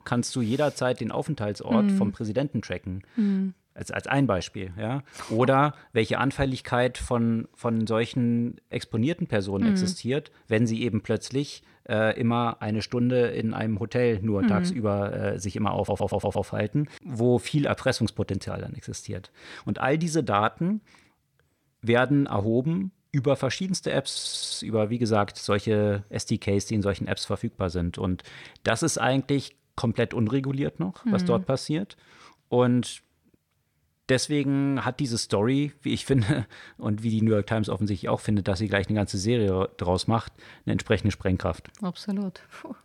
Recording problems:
audio stuttering; at 16 s and at 24 s

